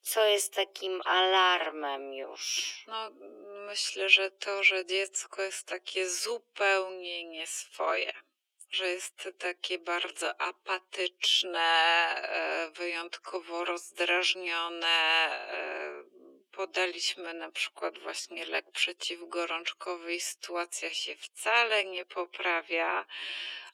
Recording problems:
thin; very; fading below 350 Hz
wrong speed, natural pitch; too slow; 0.6 times normal speed

